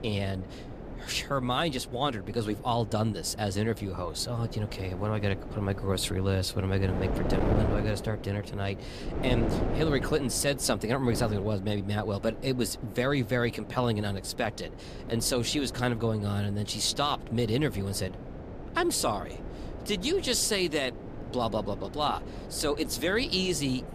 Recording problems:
wind noise on the microphone; occasional gusts; 10 dB below the speech

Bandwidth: 15 kHz